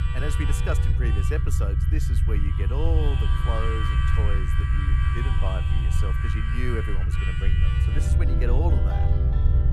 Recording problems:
background music; loud; throughout; 2 dB below the speech
low rumble; loud; throughout; 4 dB below the speech

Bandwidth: 13.5 kHz